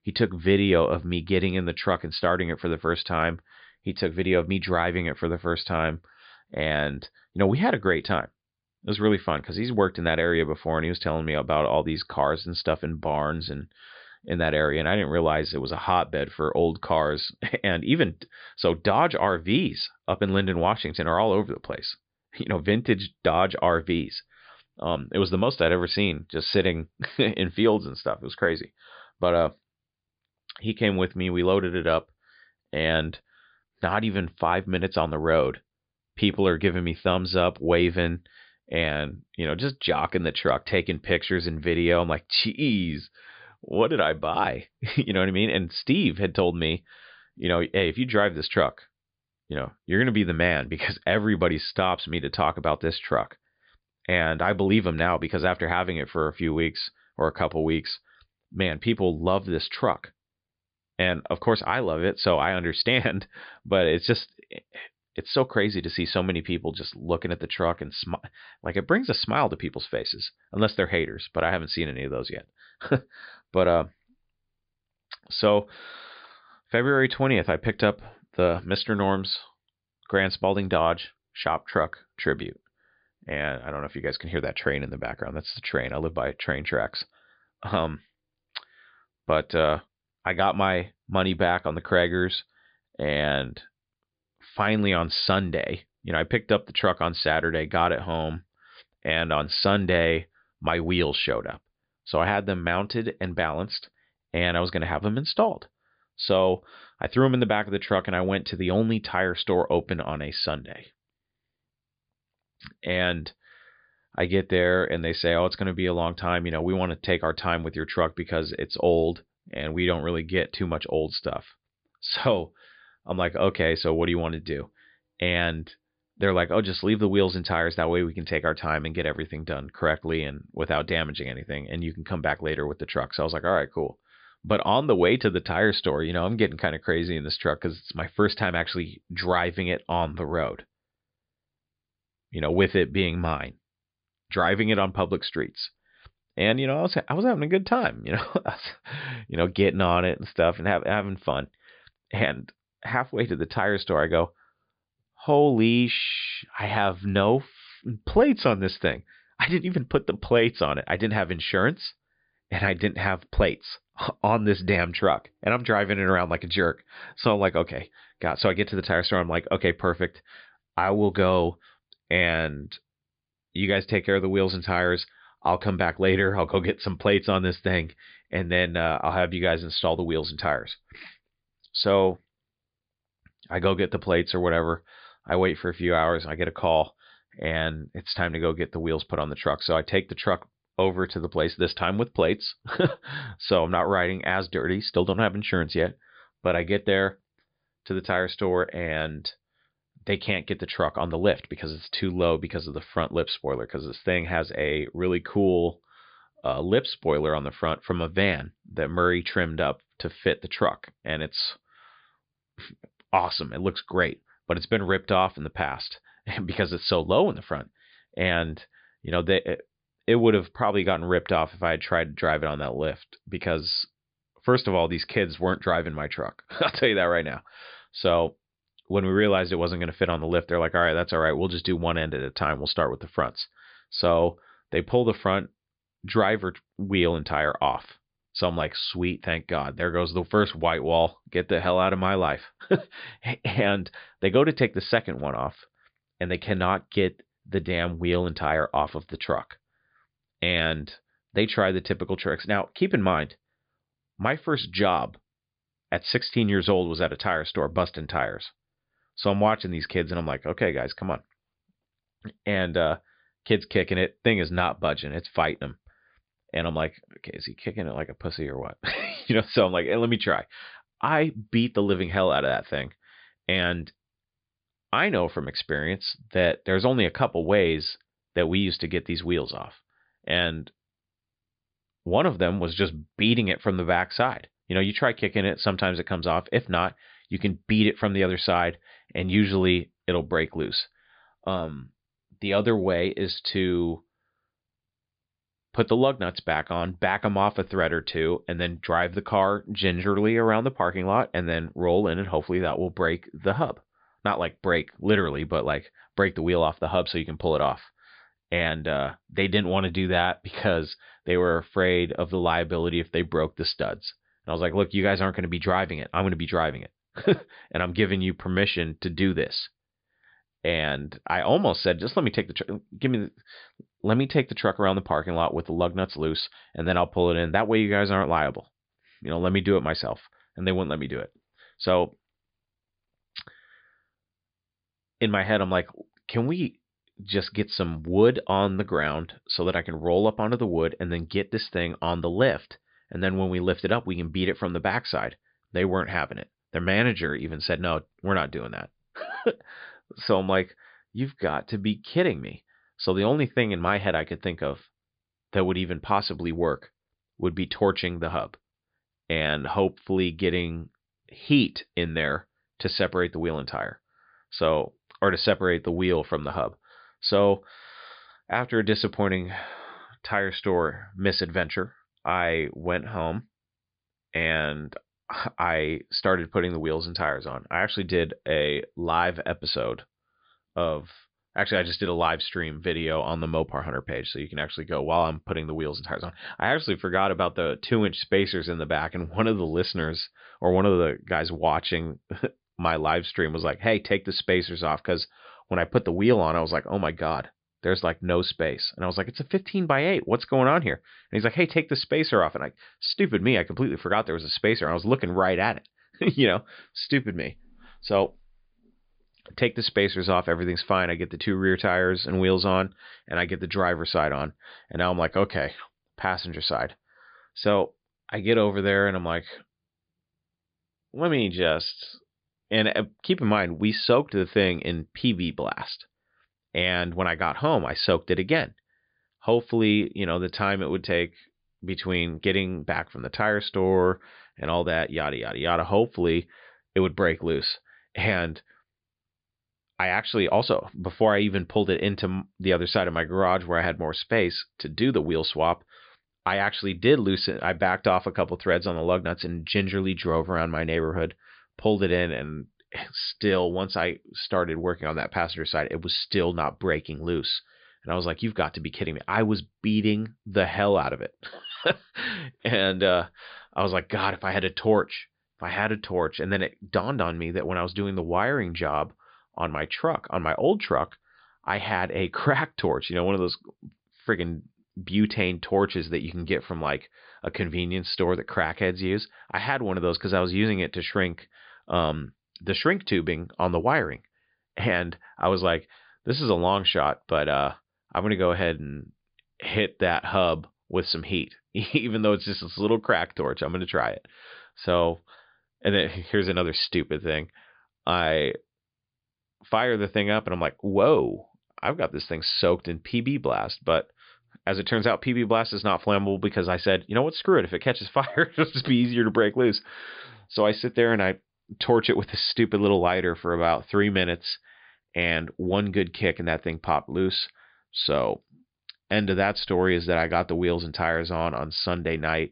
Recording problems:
high frequencies cut off; severe; nothing above 5 kHz

